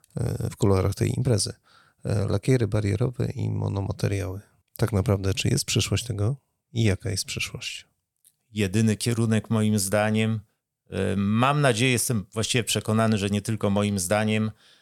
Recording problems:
none

